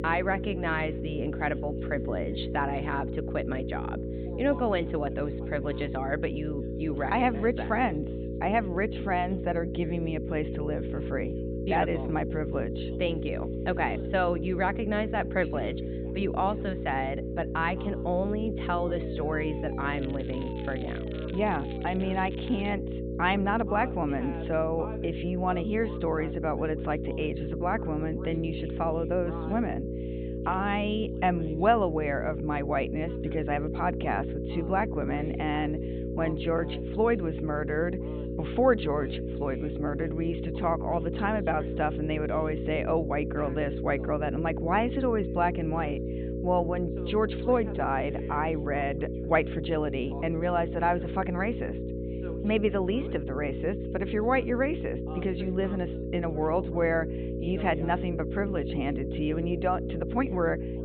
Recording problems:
high frequencies cut off; severe; nothing above 4 kHz
electrical hum; loud; throughout; 60 Hz, 8 dB below the speech
alarms or sirens; faint; until 22 s; 25 dB below the speech
voice in the background; faint; throughout; 20 dB below the speech
crackling; faint; from 20 to 23 s; 20 dB below the speech

